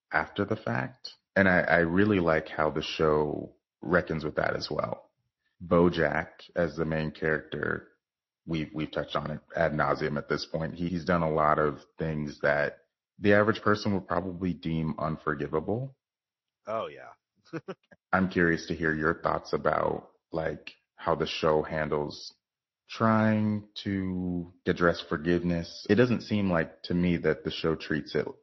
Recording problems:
garbled, watery; slightly; nothing above 5.5 kHz

